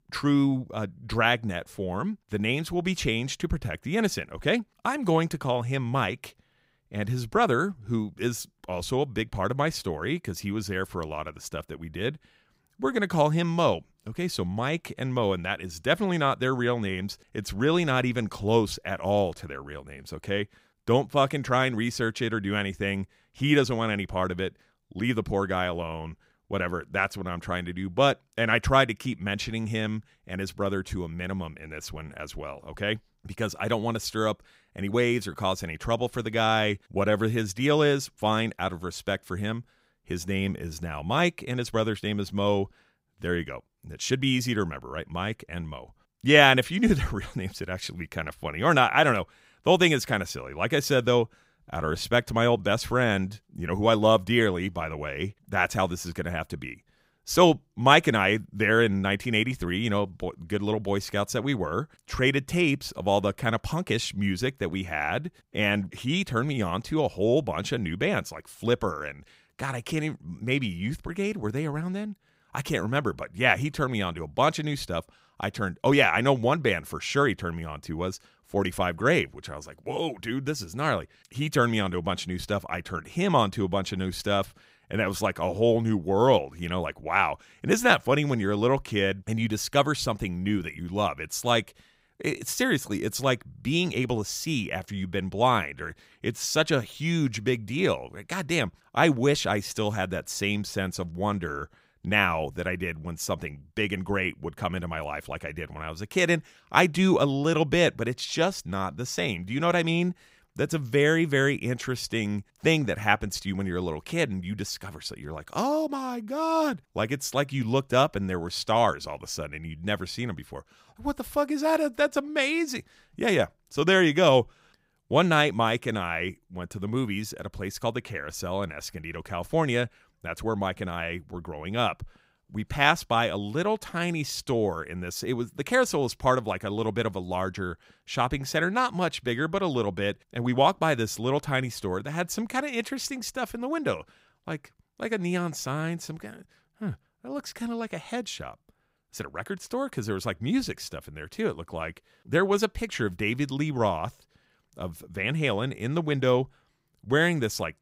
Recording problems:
none

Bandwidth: 15.5 kHz